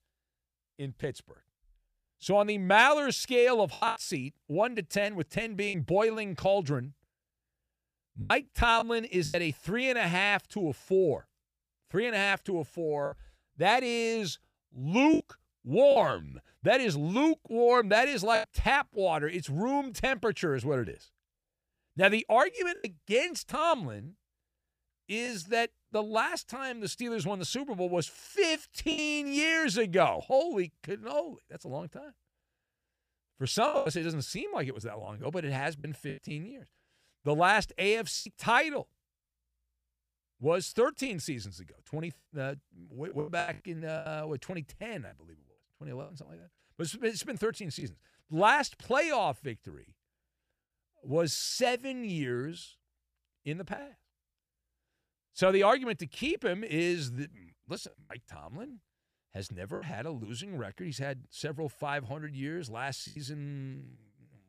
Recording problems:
choppy; occasionally; 4% of the speech affected

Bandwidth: 15 kHz